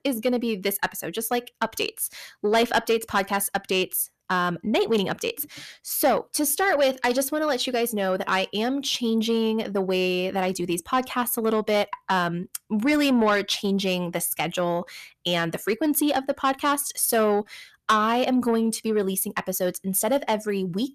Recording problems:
distortion; slight; 10 dB below the speech

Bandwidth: 14.5 kHz